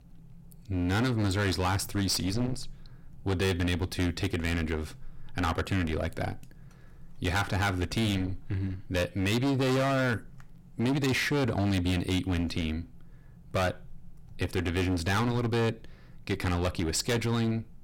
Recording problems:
distortion; heavy; 19% of the sound clipped

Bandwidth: 16.5 kHz